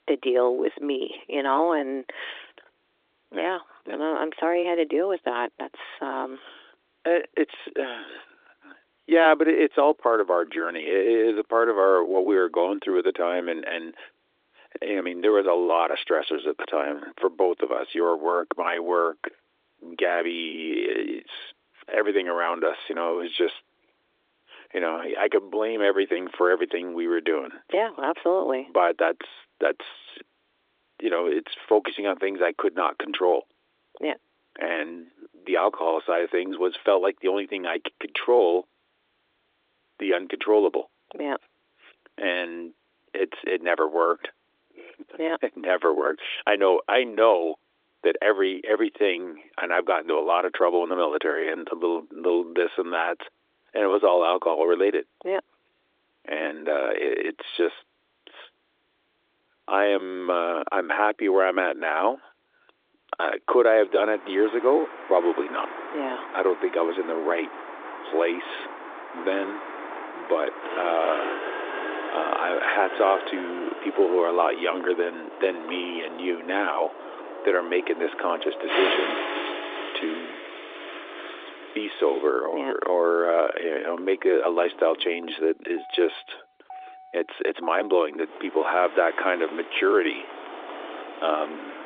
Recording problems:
phone-call audio
traffic noise; noticeable; from 1:04 on; 10 dB below the speech

